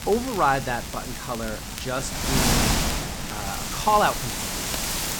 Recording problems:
wind noise on the microphone; heavy; 4 dB below the speech
crackle, like an old record; noticeable; 15 dB below the speech

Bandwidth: 17.5 kHz